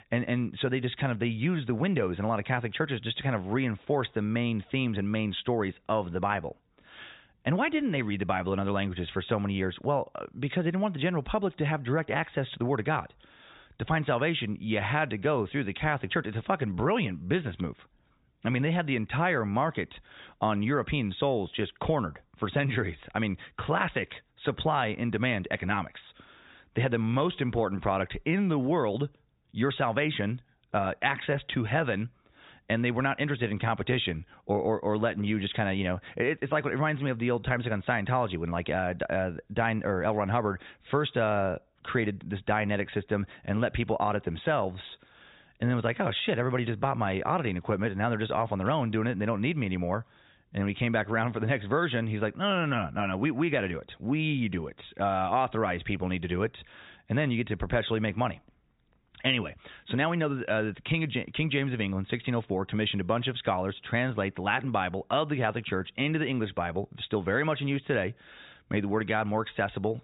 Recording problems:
high frequencies cut off; severe; nothing above 4 kHz

